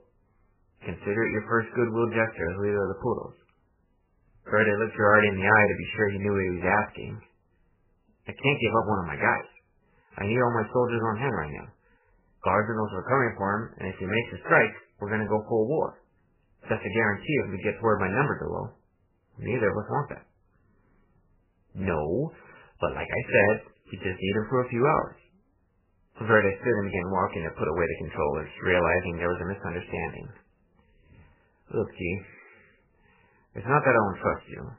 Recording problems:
garbled, watery; badly; nothing above 3 kHz

